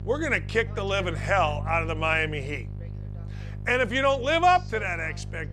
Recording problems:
electrical hum; faint; throughout; 50 Hz, 25 dB below the speech
voice in the background; faint; throughout; 25 dB below the speech

